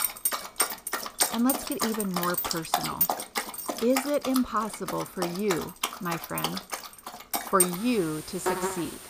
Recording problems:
animal sounds; very loud; throughout; as loud as the speech

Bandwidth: 15 kHz